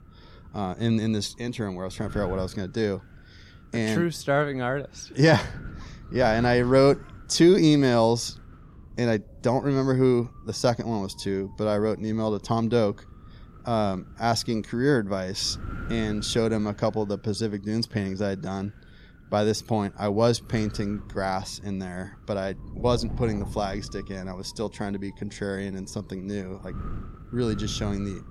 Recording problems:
wind noise on the microphone; occasional gusts; 20 dB below the speech

